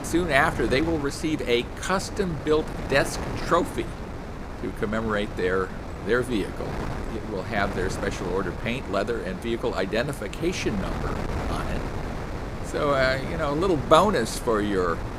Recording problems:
wind noise on the microphone; occasional gusts; 10 dB below the speech

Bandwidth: 15.5 kHz